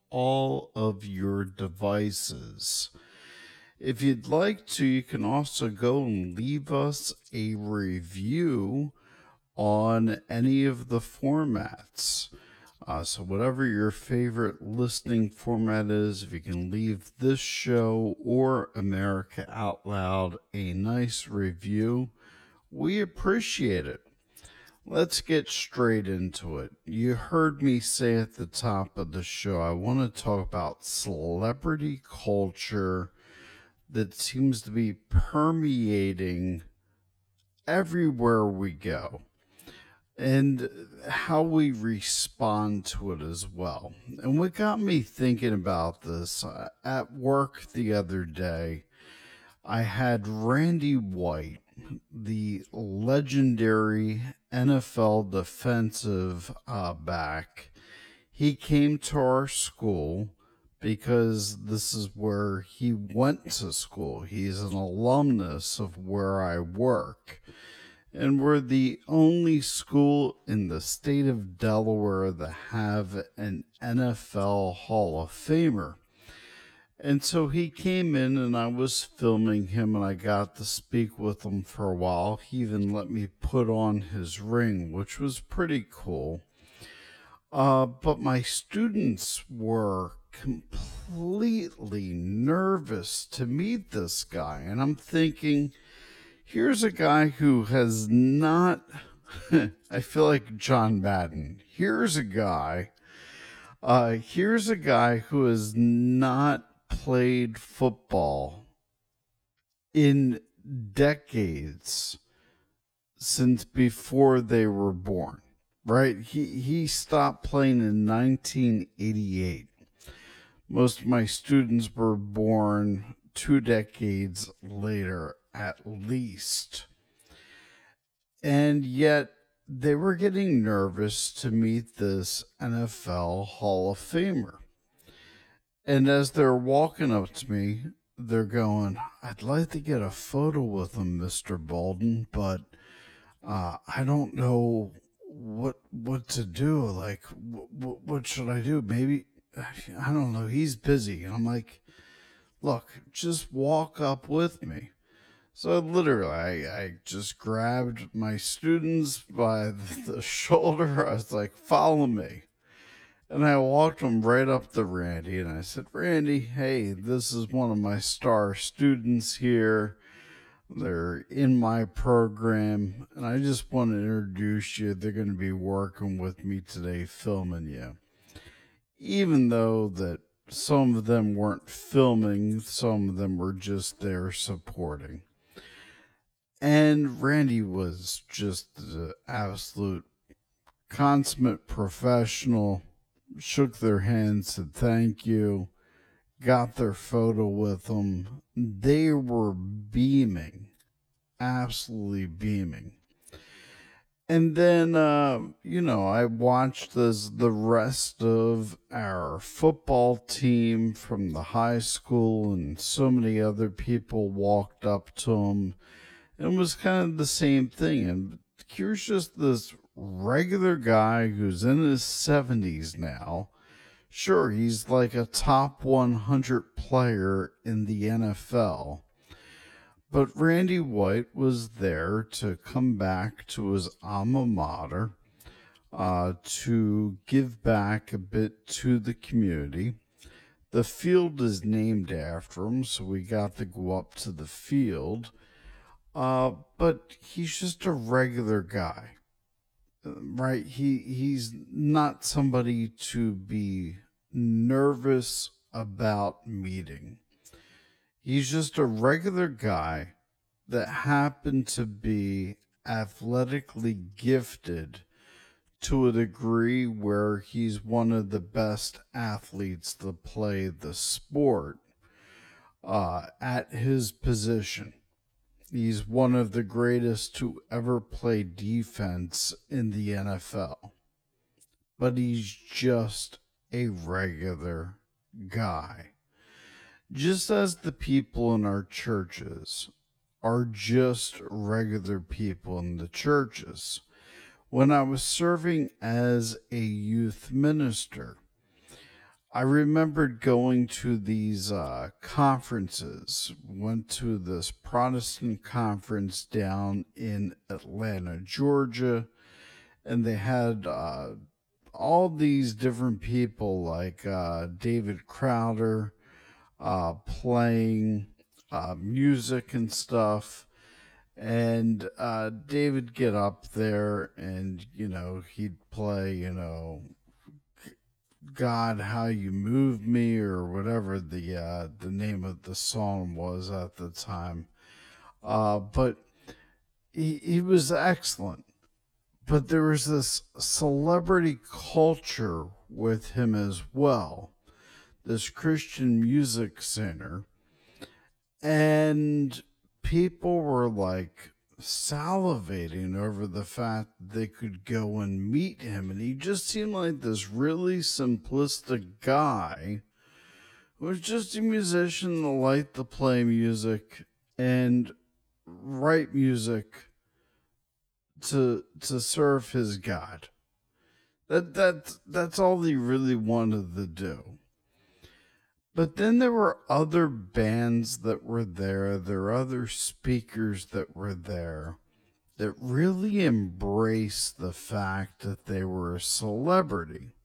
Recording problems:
wrong speed, natural pitch; too slow; 0.6 times normal speed

